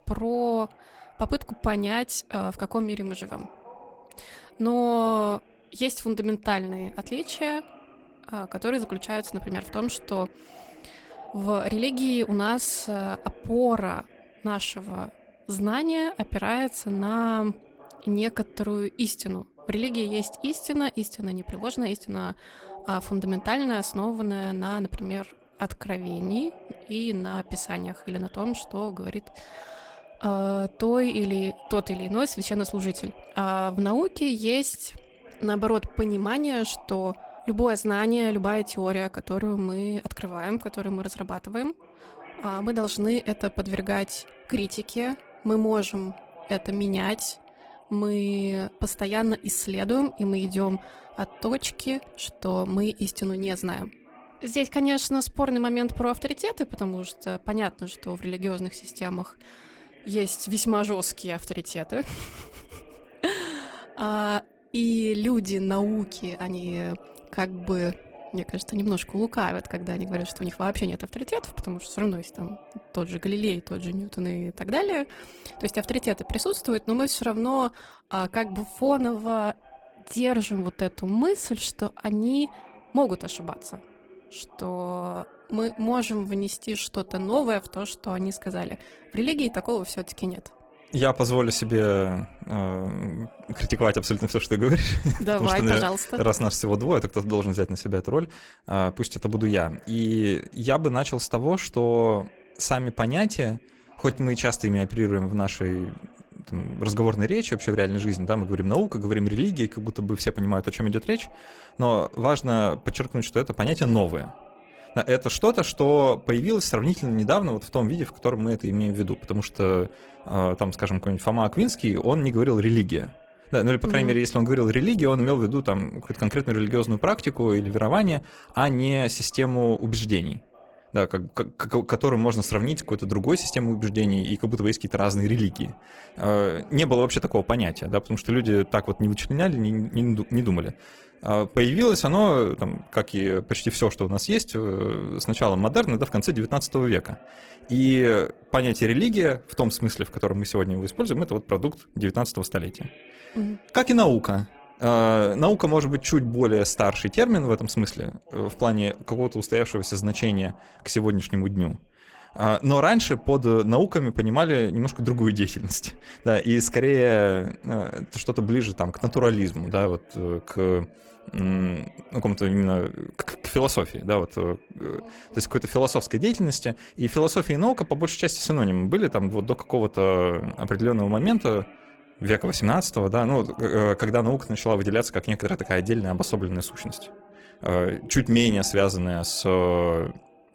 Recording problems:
garbled, watery; slightly; nothing above 17.5 kHz
voice in the background; faint; throughout; 25 dB below the speech
uneven, jittery; strongly; from 17 s to 2:50

